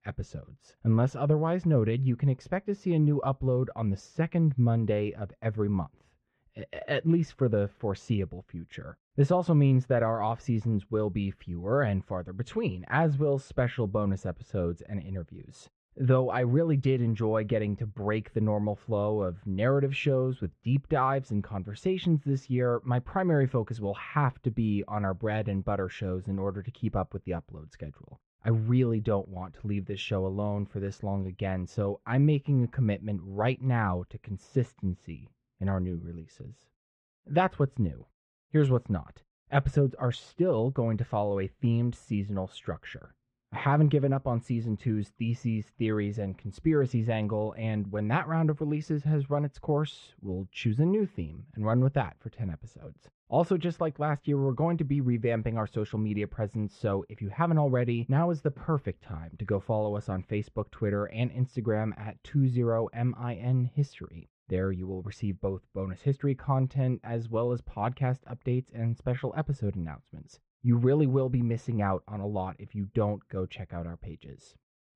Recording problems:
muffled; very; fading above 2.5 kHz

